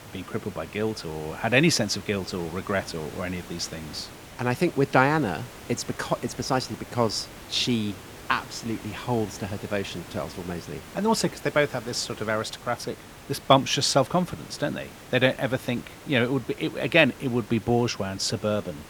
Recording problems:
hiss; noticeable; throughout; 15 dB below the speech

